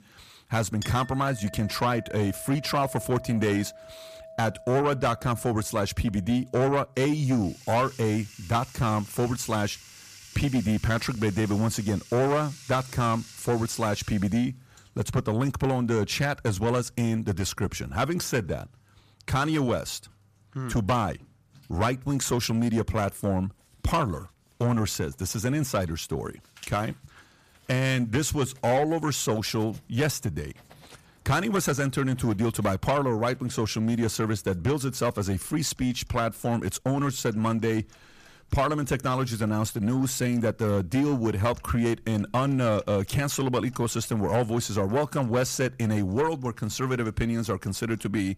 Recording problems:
distortion; slight; 10 dB below the speech
household noises; faint; throughout; 20 dB below the speech

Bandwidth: 14.5 kHz